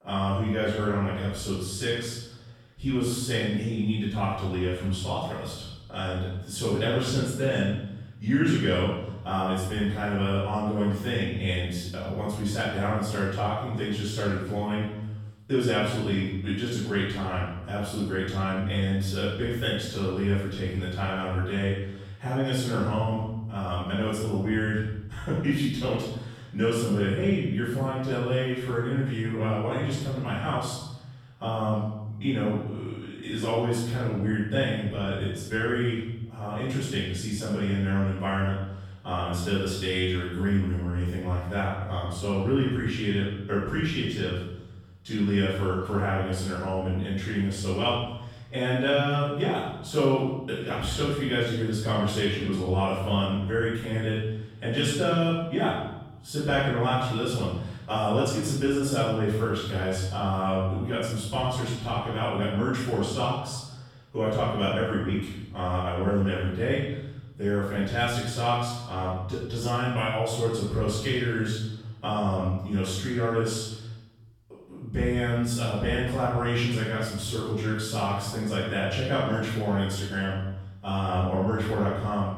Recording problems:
room echo; strong; dies away in 0.9 s
off-mic speech; far

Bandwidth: 17 kHz